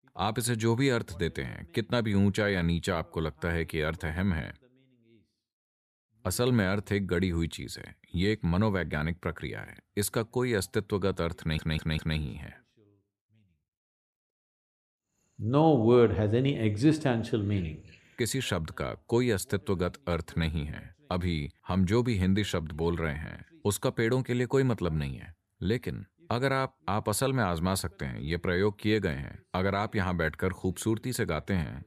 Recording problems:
audio stuttering; at 11 s

